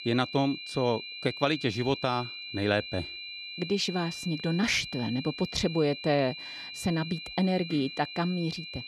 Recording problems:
high-pitched whine; loud; throughout; 4 kHz, 9 dB below the speech

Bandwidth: 13.5 kHz